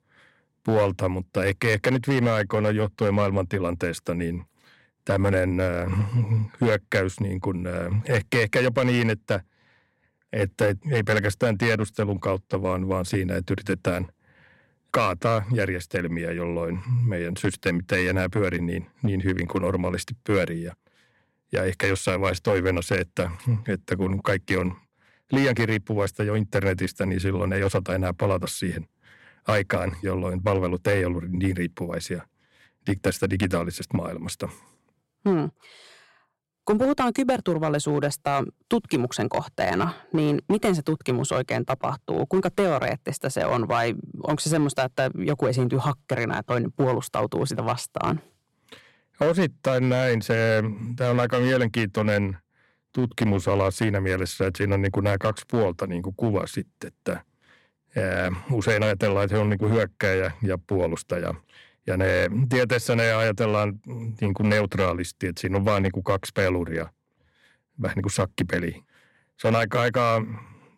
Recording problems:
distortion; slight; 4% of the sound clipped

